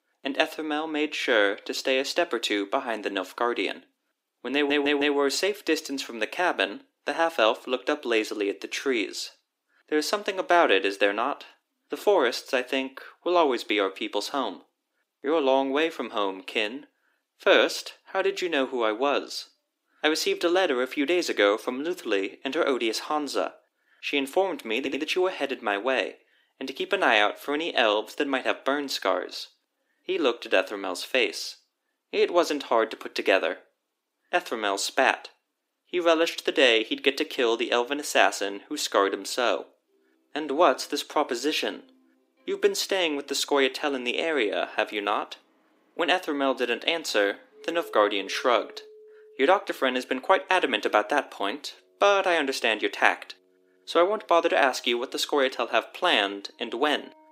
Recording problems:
thin; somewhat; fading below 300 Hz
background music; faint; from 40 s on; 30 dB below the speech
audio stuttering; at 4.5 s and at 25 s

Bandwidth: 15.5 kHz